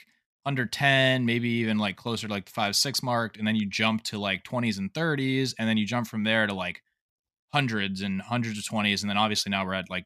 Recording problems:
none

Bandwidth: 14.5 kHz